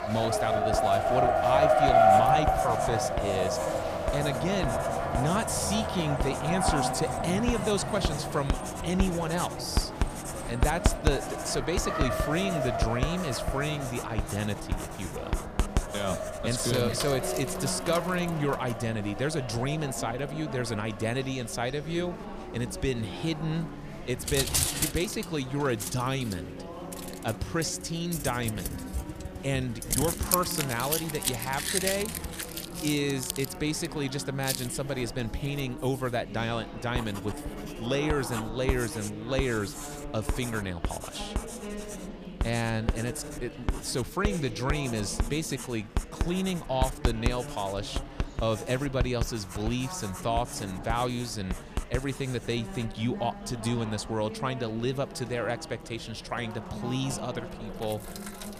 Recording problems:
traffic noise; very loud; throughout; as loud as the speech
household noises; loud; throughout; 4 dB below the speech
chatter from many people; noticeable; throughout; 10 dB below the speech

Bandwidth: 14.5 kHz